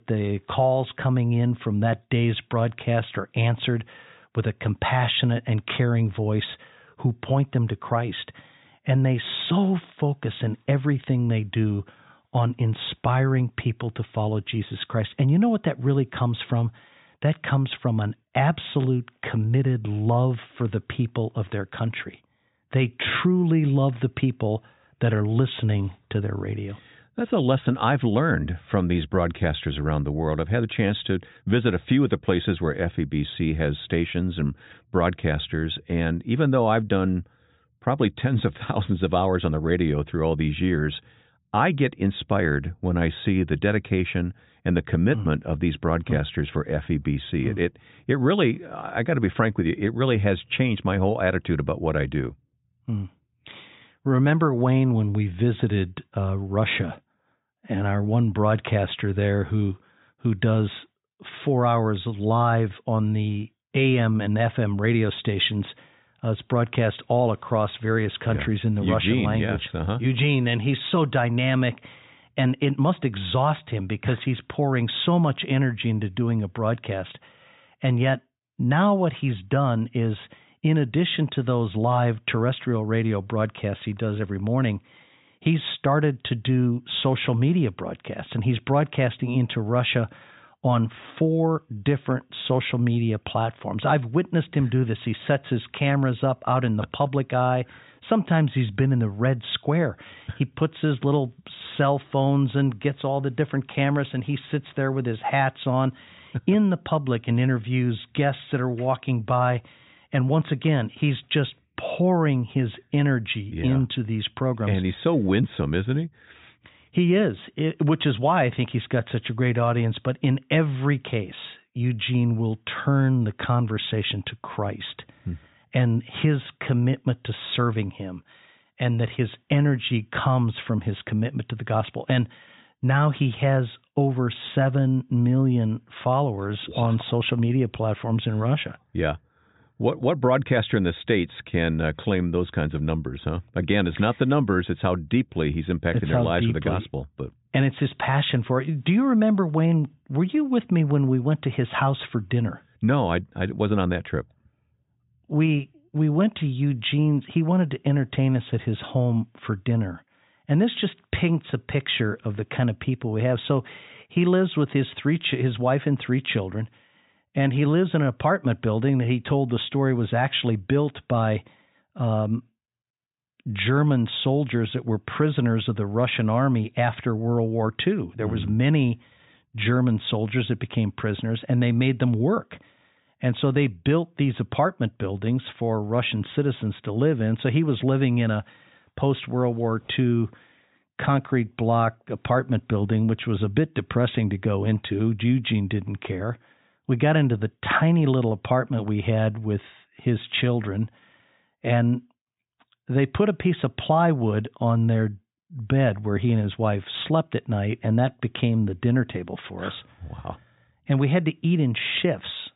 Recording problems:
high frequencies cut off; severe; nothing above 4 kHz

